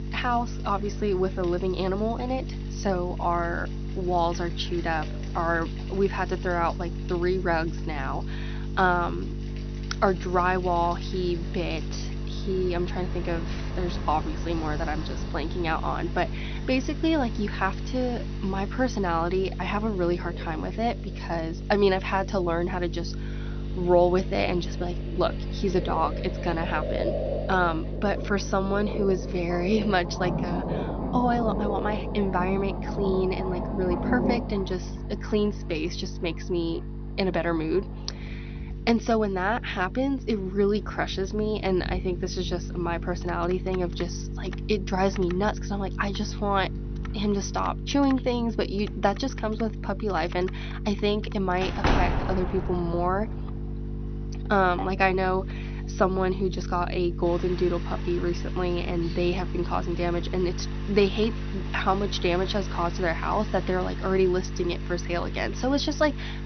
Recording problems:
high frequencies cut off; noticeable; nothing above 6 kHz
electrical hum; noticeable; throughout; 50 Hz, 15 dB below the speech
animal sounds; noticeable; throughout; 15 dB below the speech
rain or running water; noticeable; throughout; 15 dB below the speech
household noises; faint; from 20 s on; 25 dB below the speech
door banging; loud; from 52 to 53 s; peak 3 dB above the speech

